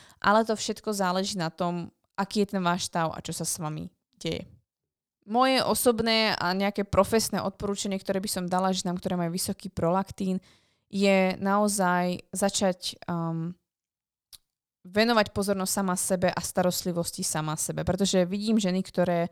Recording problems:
none

